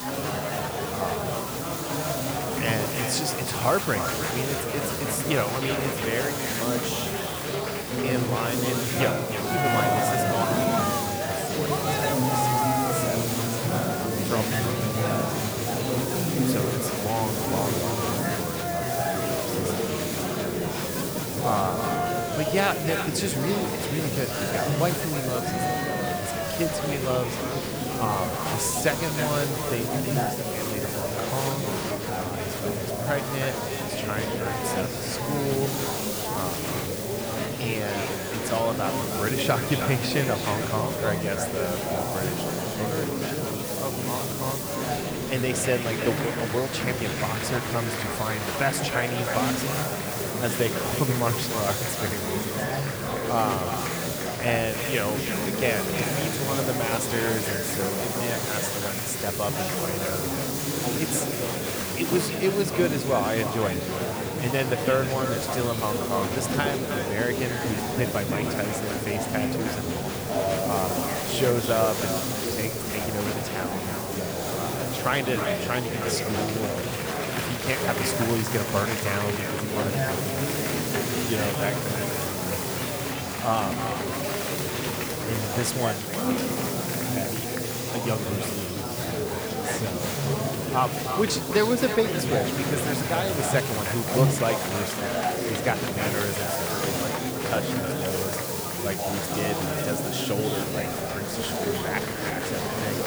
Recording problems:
echo of what is said; strong; throughout; 310 ms later, 10 dB below the speech
murmuring crowd; very loud; throughout; 1 dB above the speech
hiss; loud; throughout; 3 dB below the speech
rain or running water; noticeable; throughout; 20 dB below the speech

